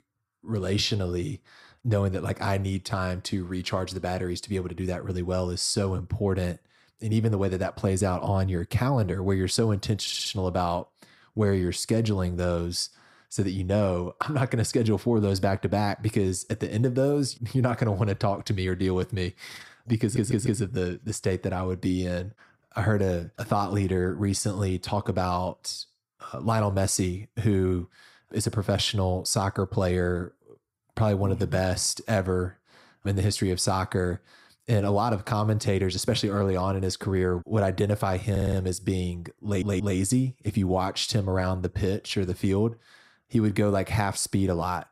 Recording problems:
audio stuttering; 4 times, first at 10 s

